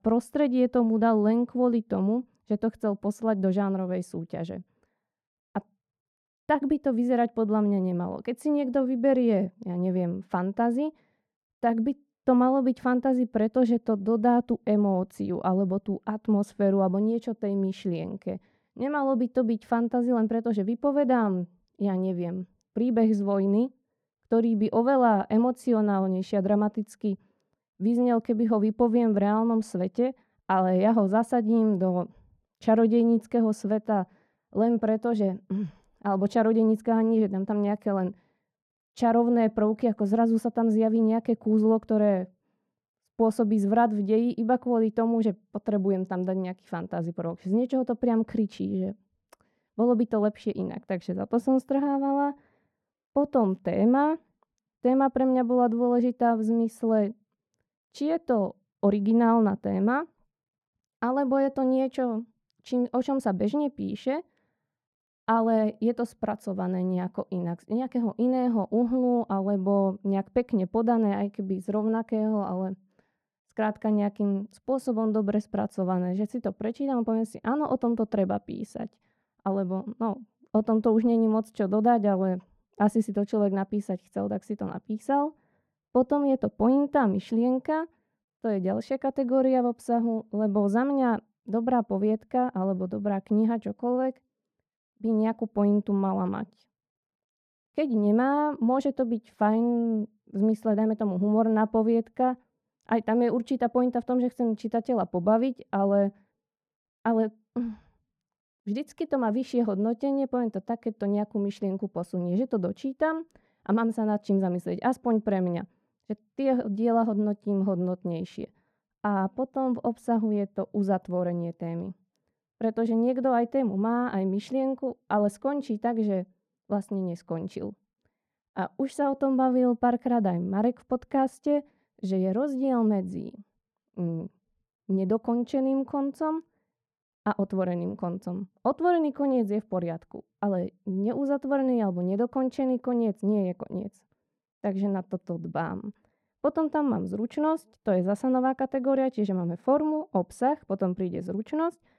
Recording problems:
muffled; very; fading above 2 kHz

